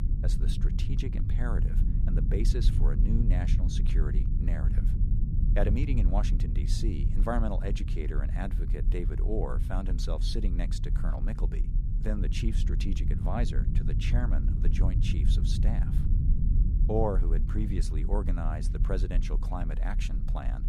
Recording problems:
low rumble; loud; throughout; 7 dB below the speech

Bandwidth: 14.5 kHz